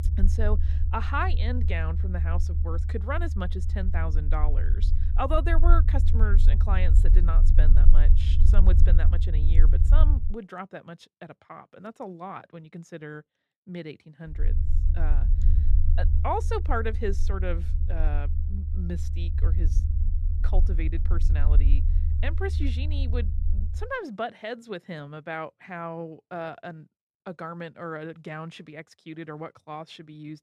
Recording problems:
low rumble; loud; until 10 s and from 14 to 24 s; 10 dB below the speech

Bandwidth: 14.5 kHz